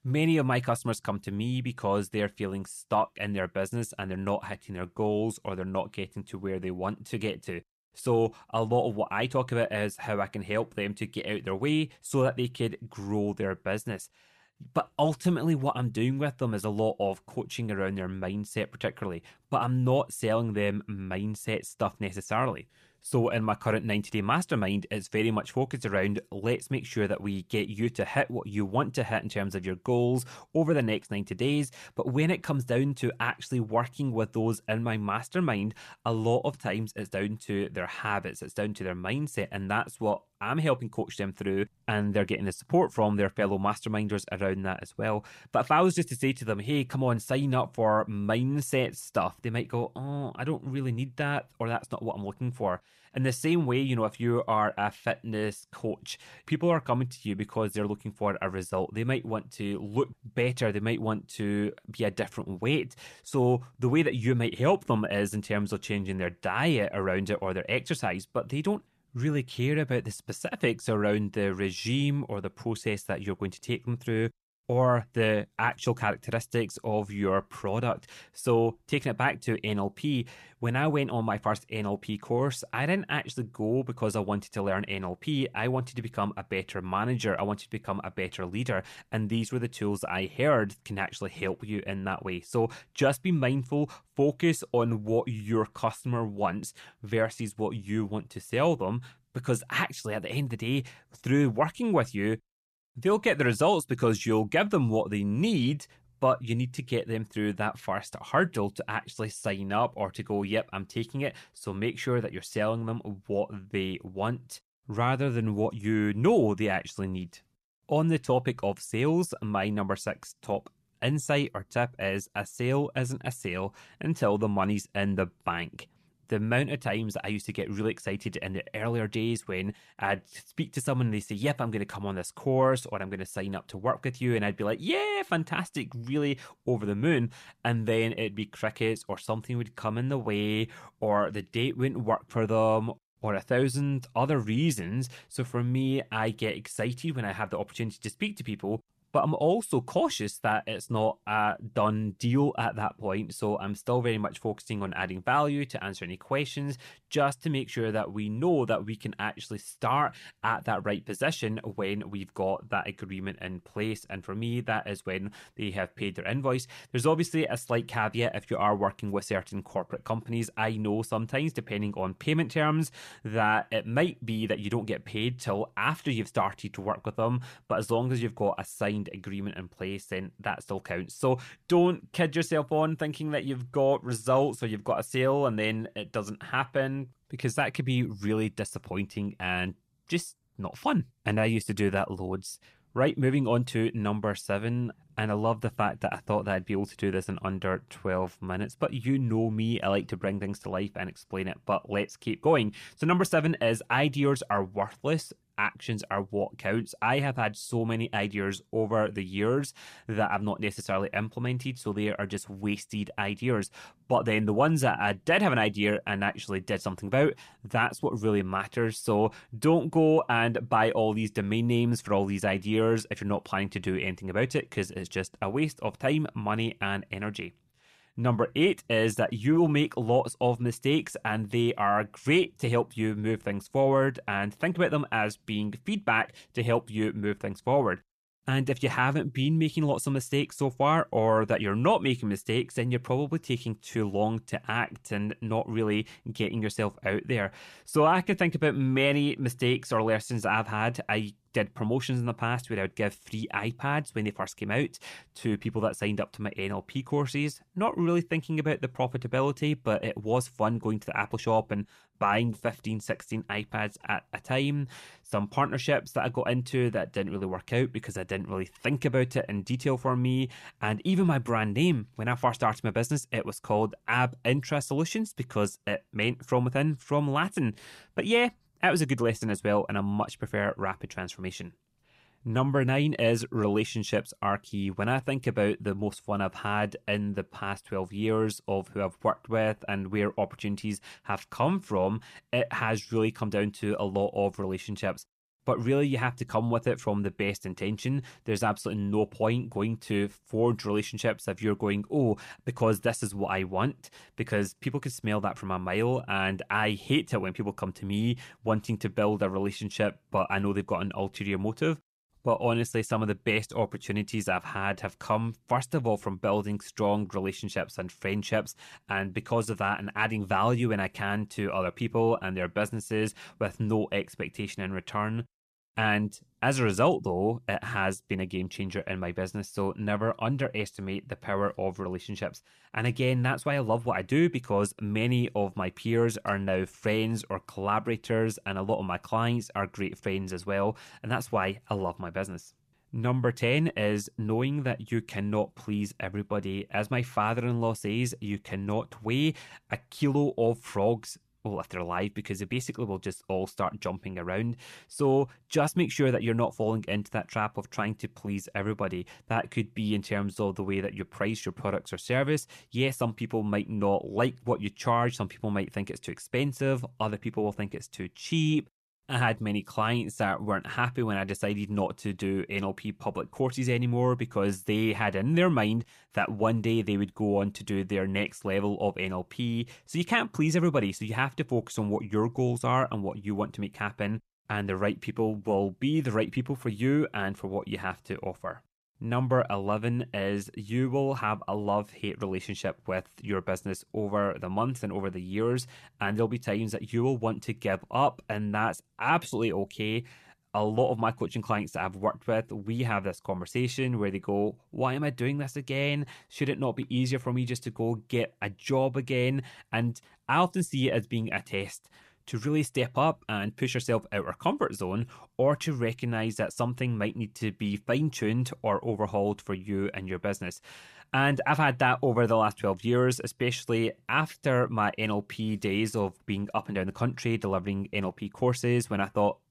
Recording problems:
none

